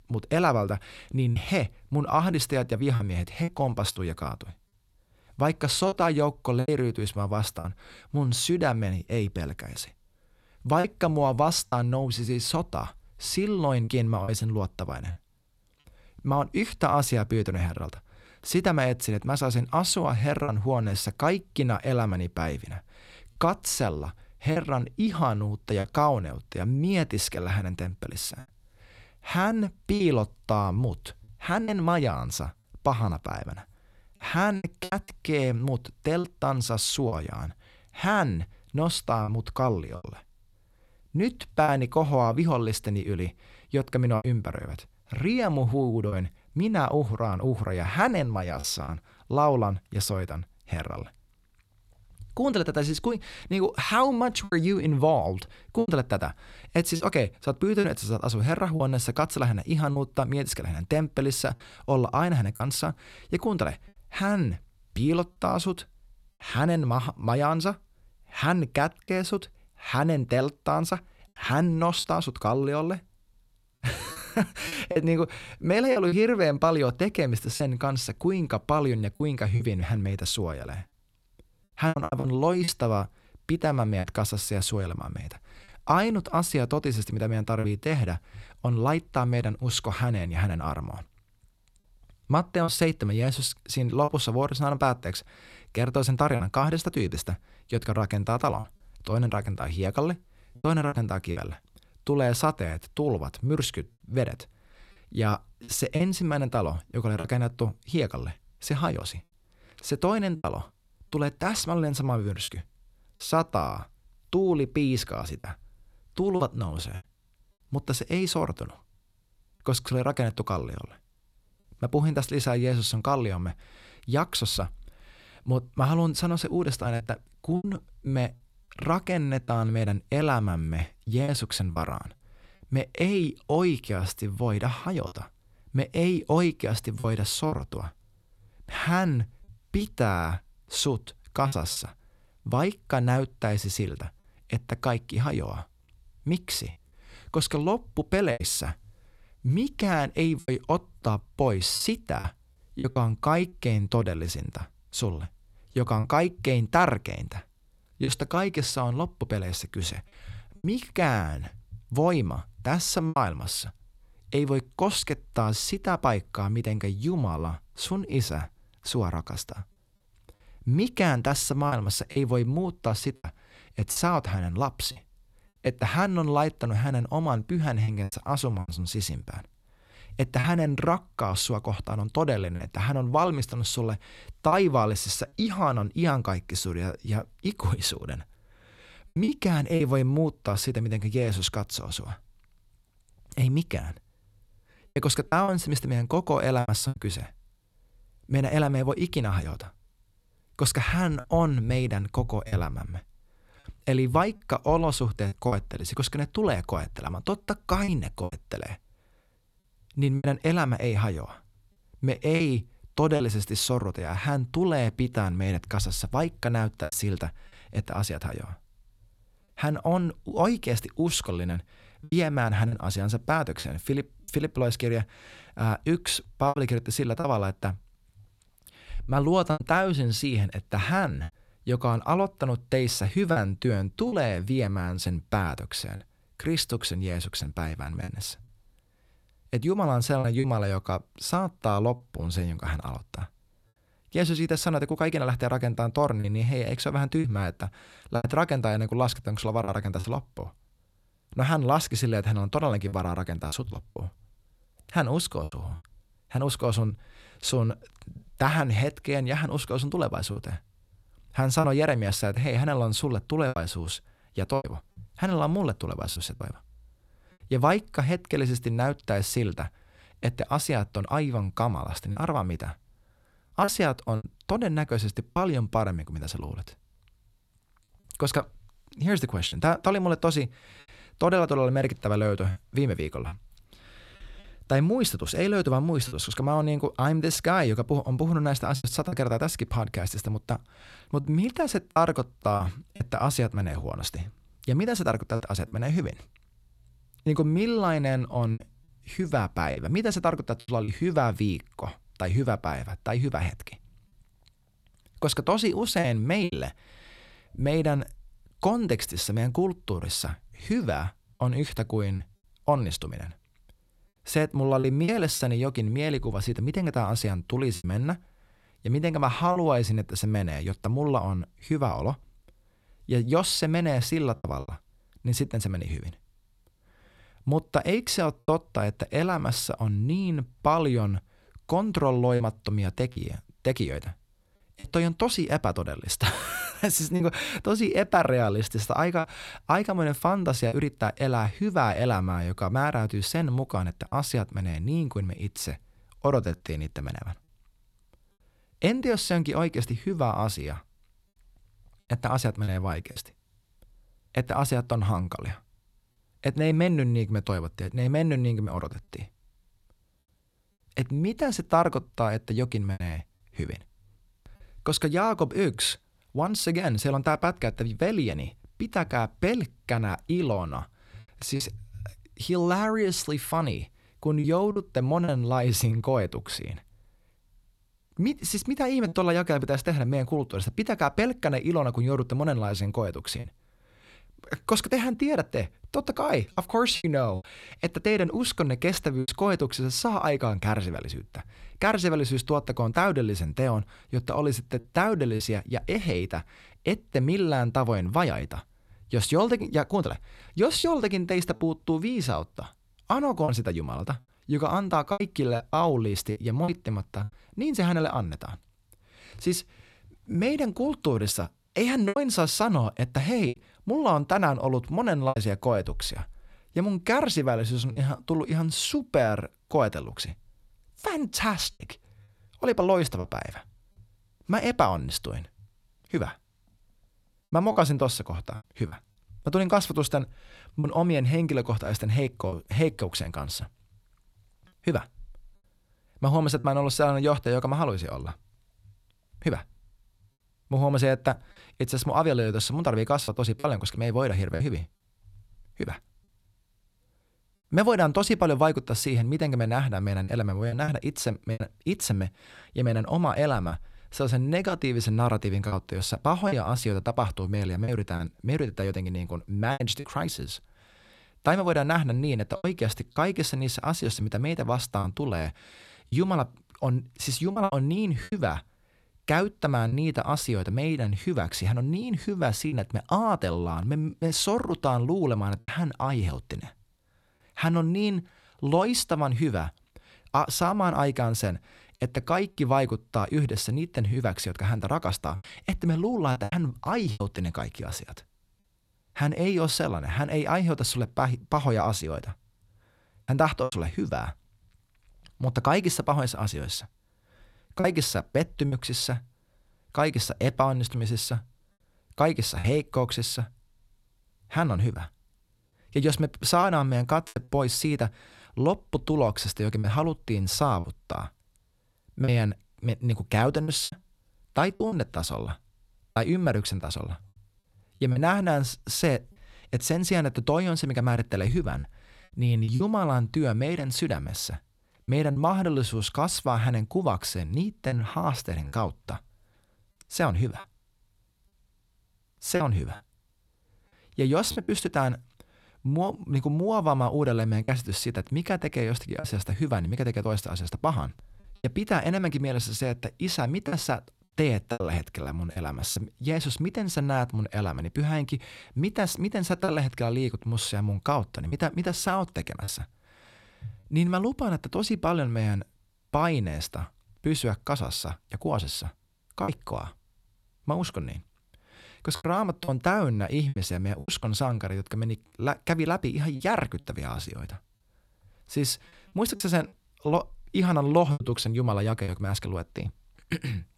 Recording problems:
choppy; occasionally; 3% of the speech affected

